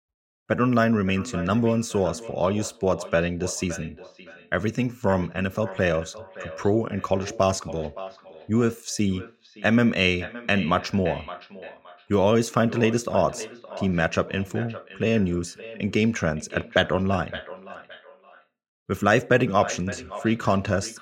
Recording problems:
echo of what is said; noticeable; throughout; 570 ms later, 15 dB below the speech

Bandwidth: 16 kHz